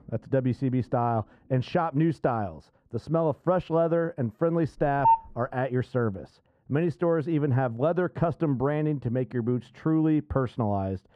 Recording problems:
muffled; very; fading above 2 kHz
phone ringing; loud; at 5 s; peak 4 dB above the speech

